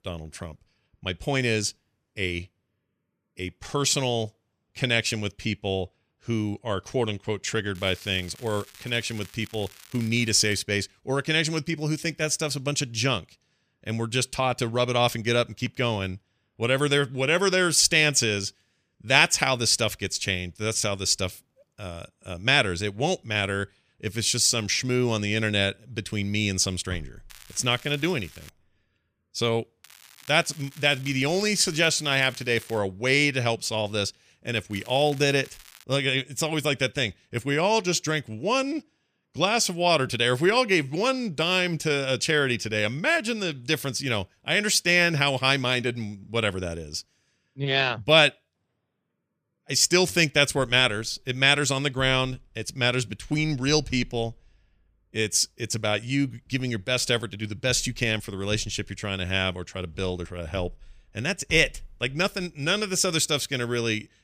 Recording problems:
crackling; faint; 4 times, first at 8 s; 25 dB below the speech

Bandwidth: 15 kHz